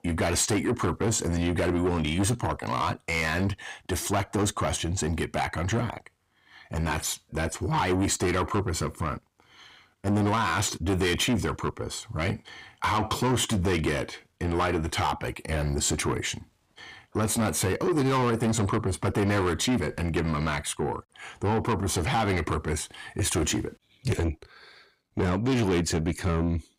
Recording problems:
distortion; heavy; 7 dB below the speech

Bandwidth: 15.5 kHz